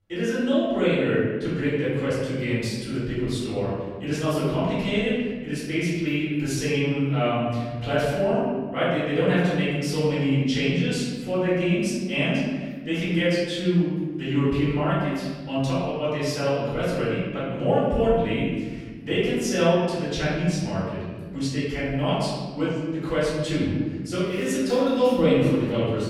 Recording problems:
room echo; strong; dies away in 1.6 s
off-mic speech; far

